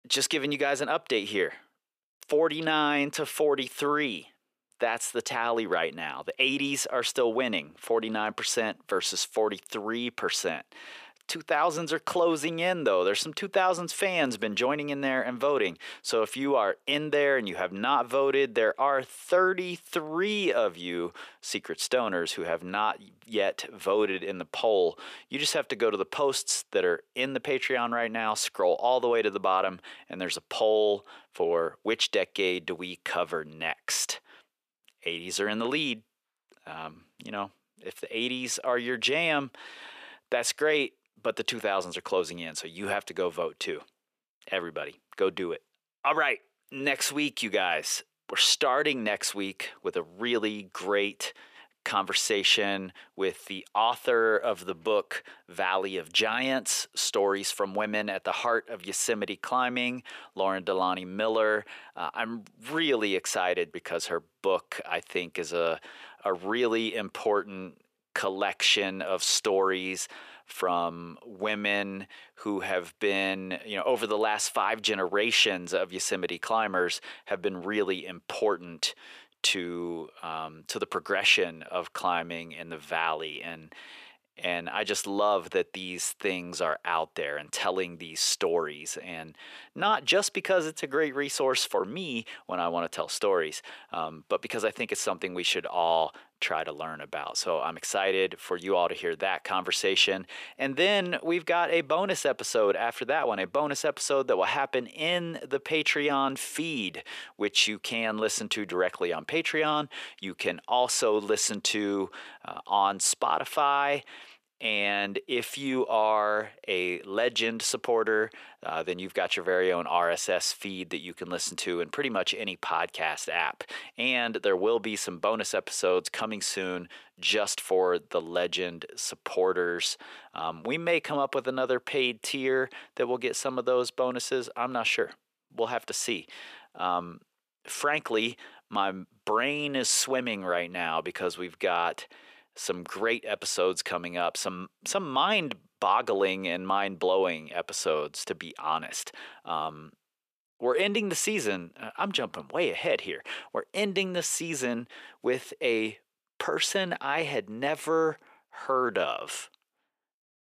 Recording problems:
thin; somewhat; fading below 450 Hz

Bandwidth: 14.5 kHz